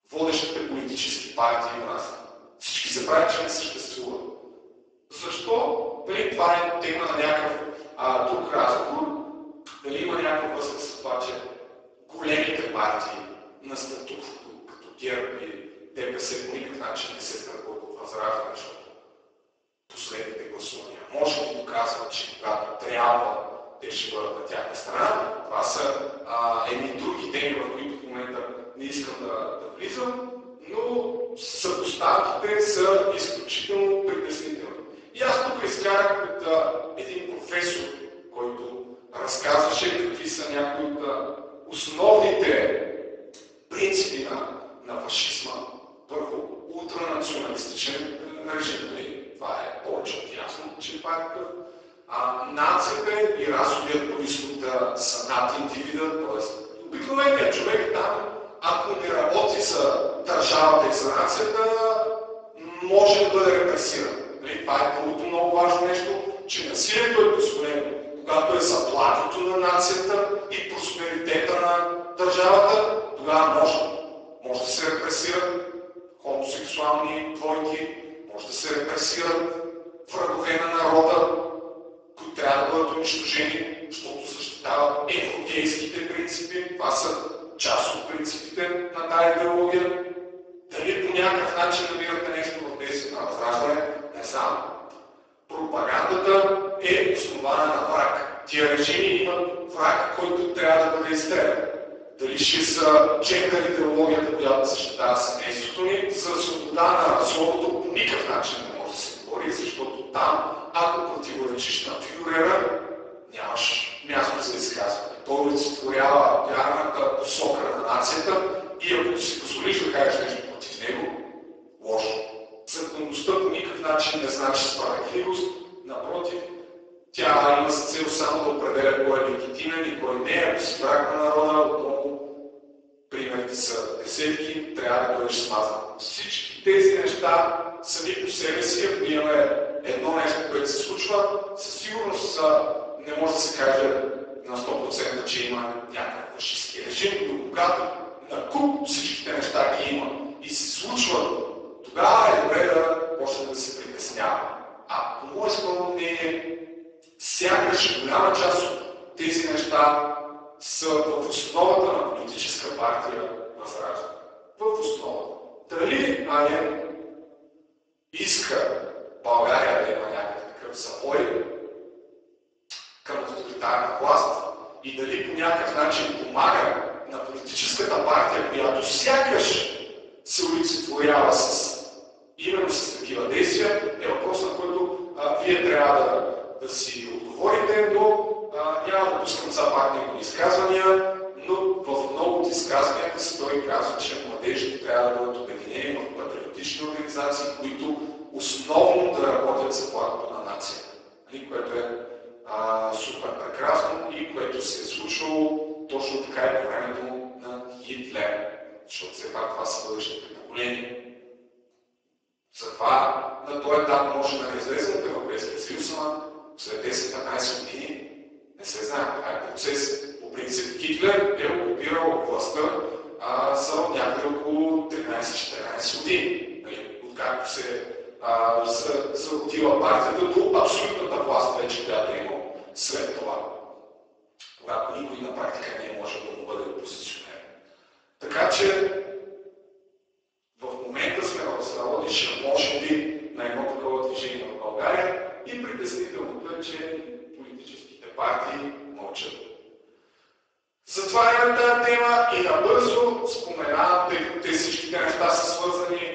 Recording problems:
off-mic speech; far
garbled, watery; badly; nothing above 8 kHz
room echo; noticeable; dies away in 1.2 s
thin; somewhat; fading below 300 Hz

